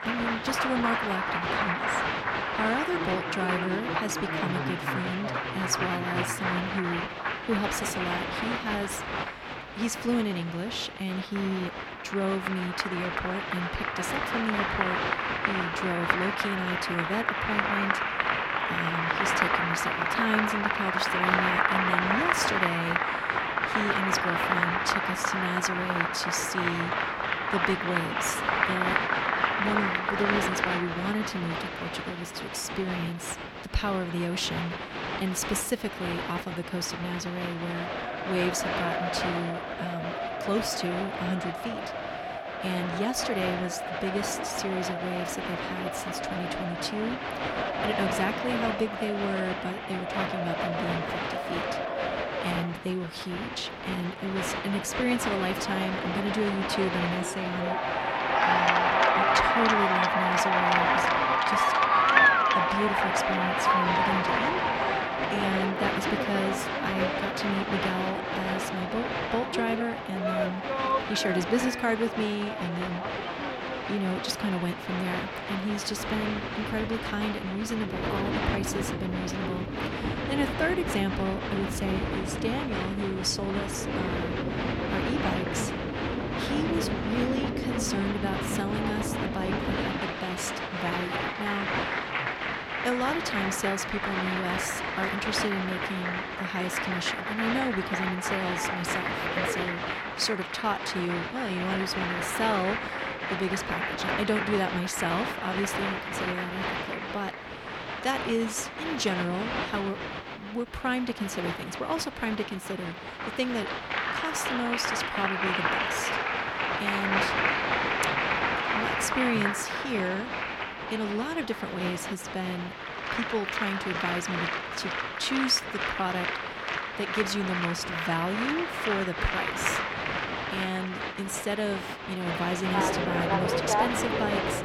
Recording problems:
crowd noise; very loud; throughout; 3 dB above the speech

